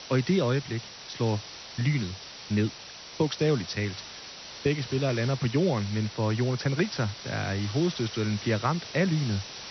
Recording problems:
high frequencies cut off; noticeable; nothing above 6 kHz
hiss; noticeable; throughout; 10 dB below the speech

